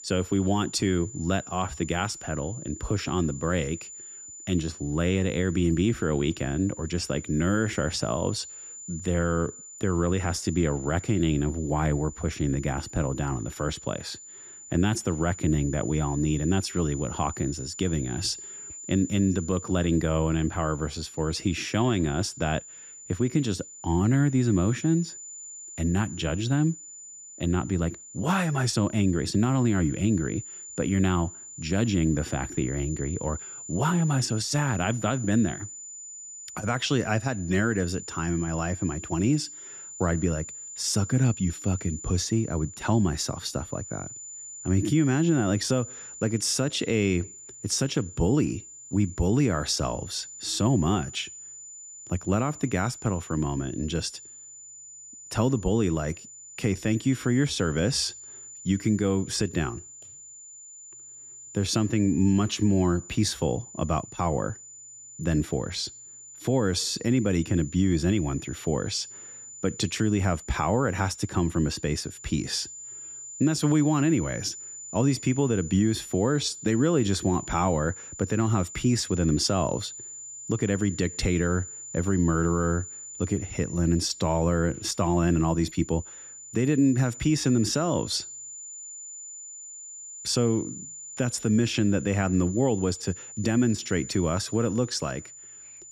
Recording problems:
high-pitched whine; noticeable; throughout; 7 kHz, 15 dB below the speech

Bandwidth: 14.5 kHz